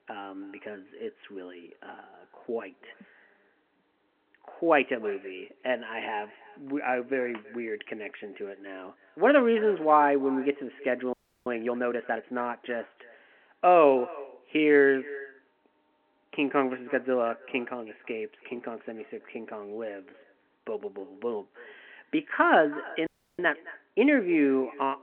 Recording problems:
echo of what is said; faint; throughout; 320 ms later, 20 dB below the speech
phone-call audio
audio freezing; at 11 s and at 23 s

